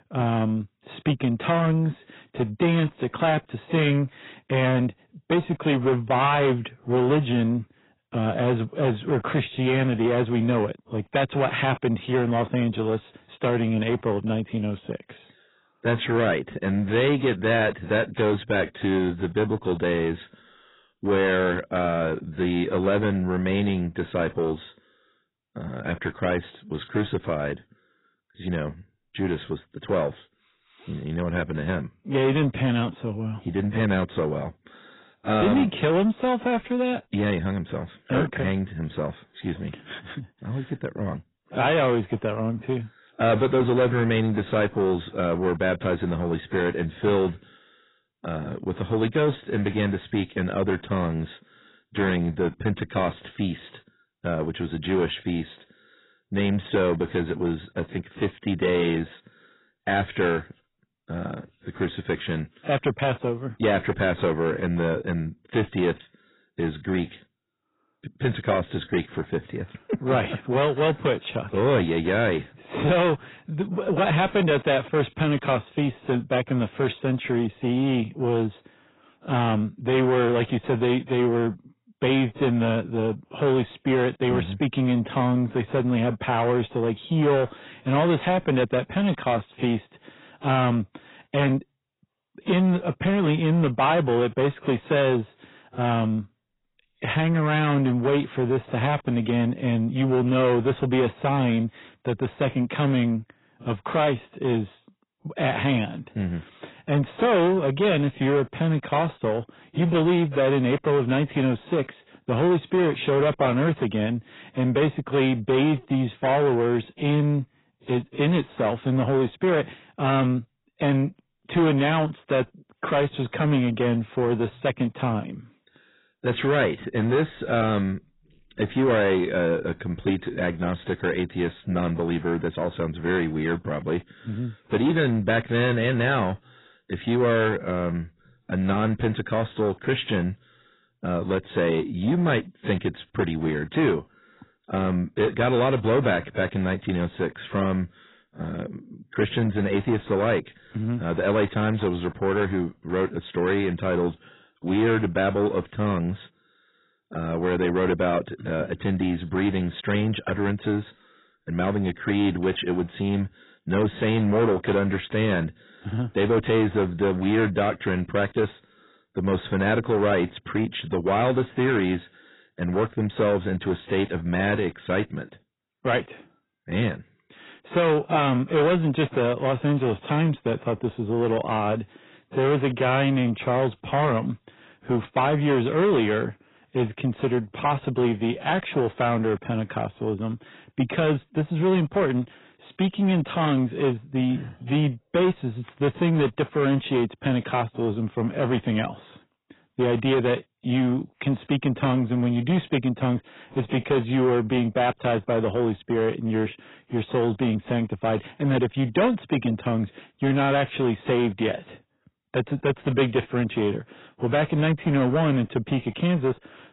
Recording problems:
garbled, watery; badly; nothing above 4 kHz
distortion; slight; 10 dB below the speech

